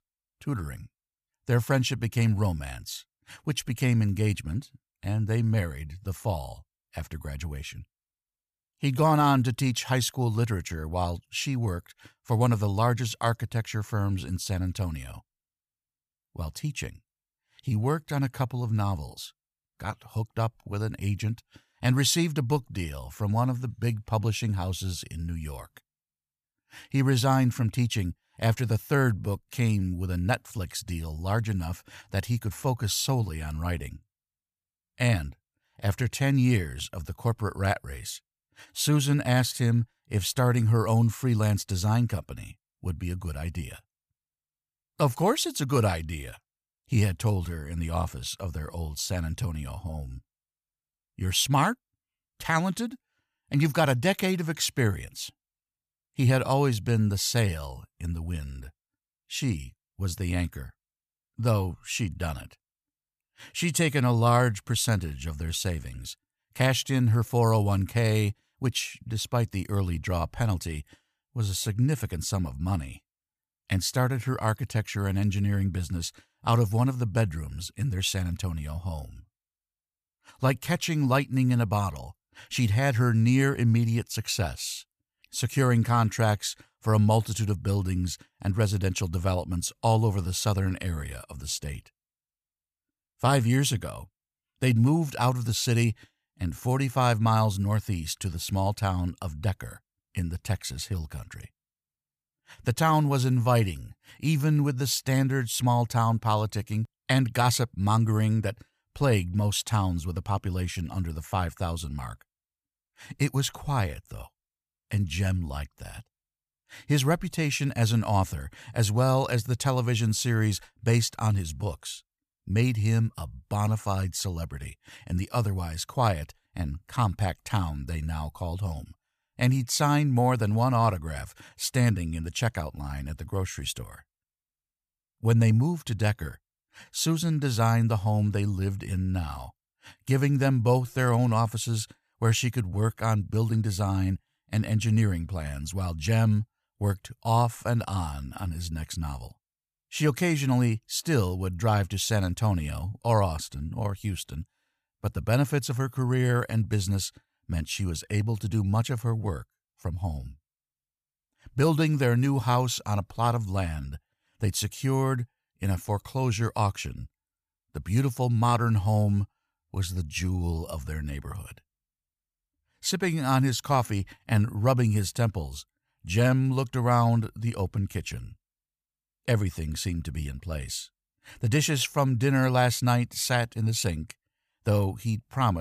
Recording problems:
abrupt cut into speech; at the end

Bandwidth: 14.5 kHz